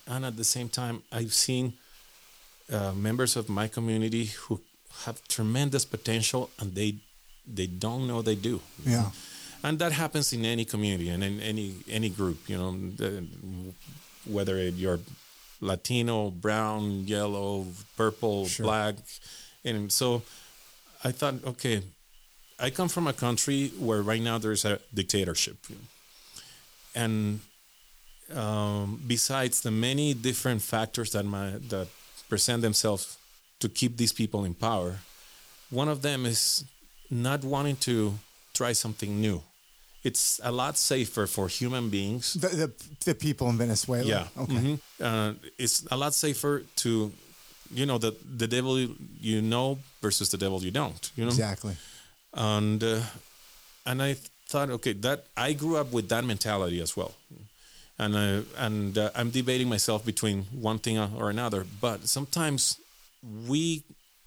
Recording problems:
hiss; faint; throughout; 25 dB below the speech

